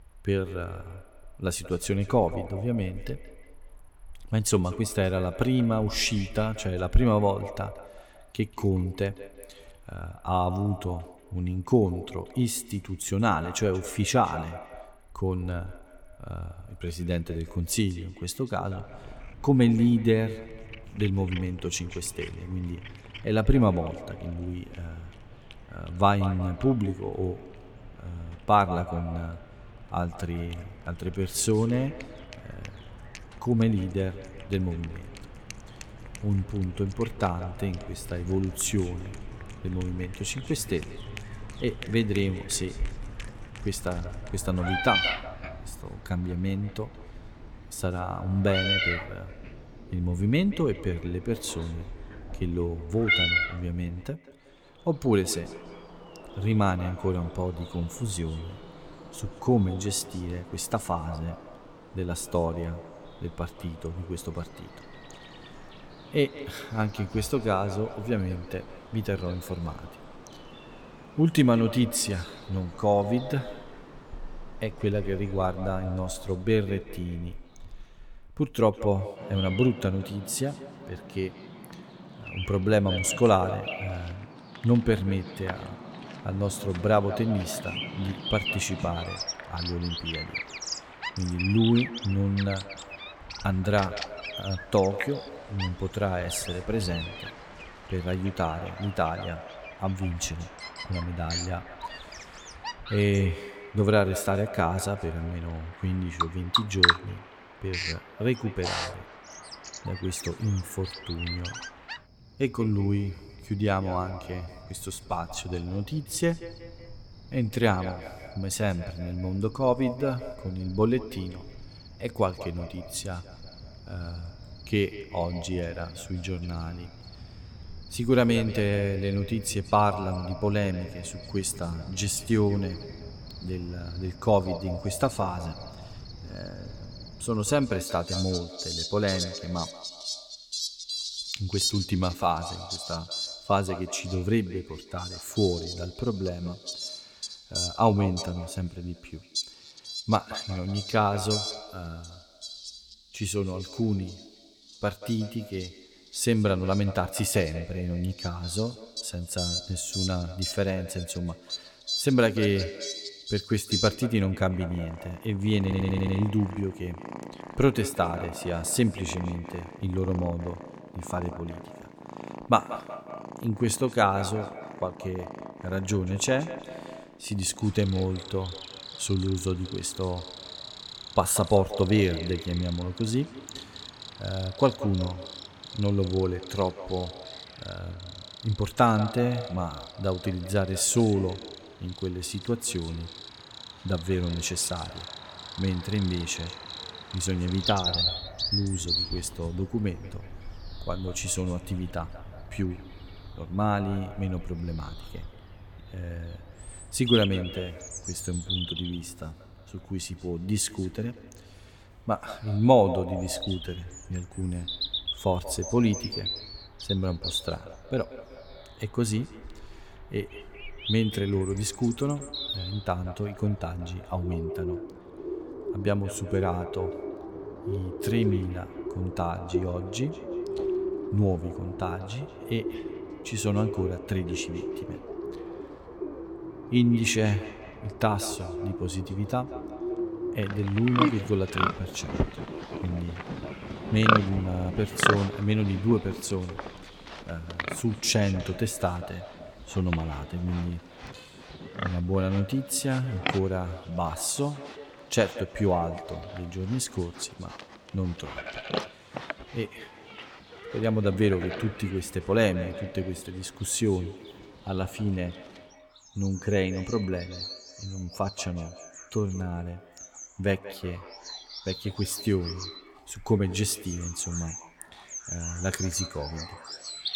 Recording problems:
echo of what is said; noticeable; throughout; 180 ms later, 15 dB below the speech
animal sounds; loud; throughout; 7 dB below the speech
audio stuttering; at 2:46 and at 4:04

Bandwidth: 17.5 kHz